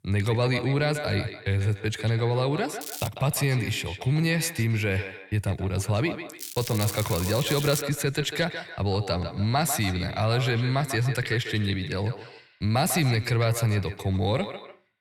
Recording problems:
echo of what is said; strong; throughout; 150 ms later, 10 dB below the speech
crackling; loud; at 3 s and from 6.5 to 8 s; 9 dB below the speech

